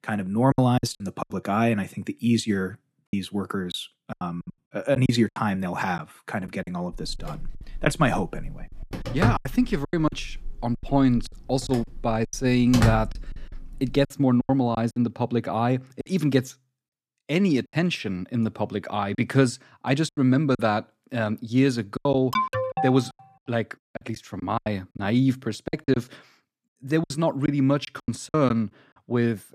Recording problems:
choppy; very; 10% of the speech affected
phone ringing; loud; from 7 to 14 s; peak 1 dB above the speech
alarm; noticeable; at 22 s; peak level with the speech

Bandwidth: 14.5 kHz